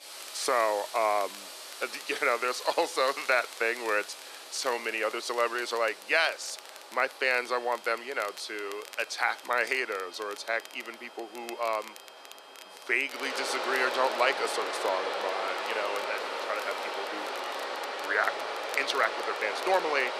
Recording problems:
thin; very; fading below 400 Hz
rain or running water; loud; throughout; 6 dB below the speech
crackle, like an old record; noticeable; 20 dB below the speech
high-pitched whine; faint; from 7 to 17 s; 3 kHz, 25 dB below the speech

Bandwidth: 14.5 kHz